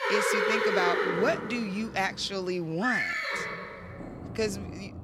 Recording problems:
animal sounds; very loud; throughout; 1 dB above the speech

